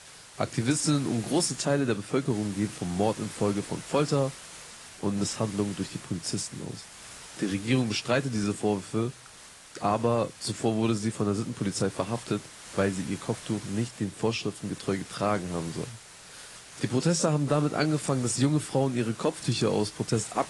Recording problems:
garbled, watery; slightly; nothing above 10 kHz
hiss; noticeable; throughout; 15 dB below the speech

